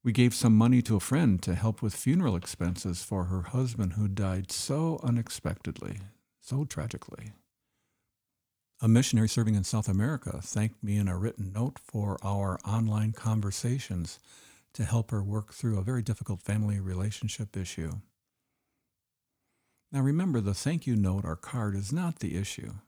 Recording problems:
uneven, jittery; strongly; from 1 to 17 s

